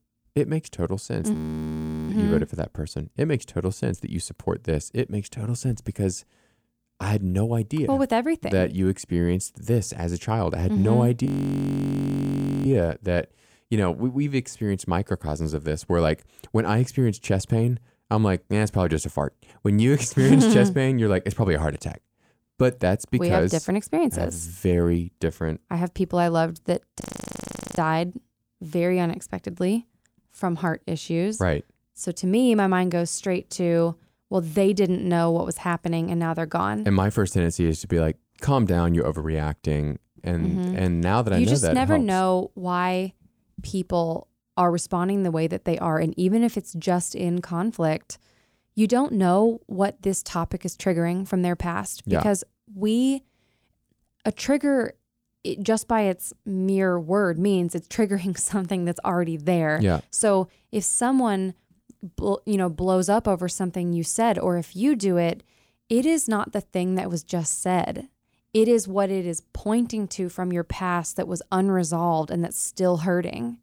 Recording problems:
audio freezing; at 1.5 s for 0.5 s, at 11 s for 1.5 s and at 27 s for 1 s

